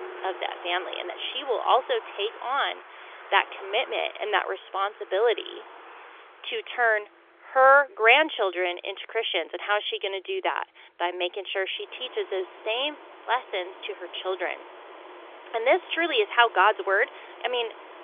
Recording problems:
phone-call audio; nothing above 3.5 kHz
traffic noise; noticeable; throughout; 20 dB below the speech

